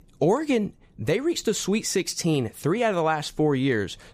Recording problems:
none

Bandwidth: 15 kHz